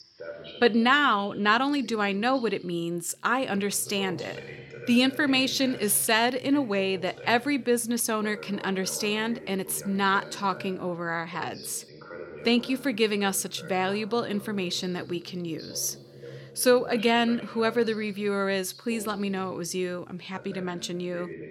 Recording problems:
voice in the background; noticeable; throughout; 15 dB below the speech

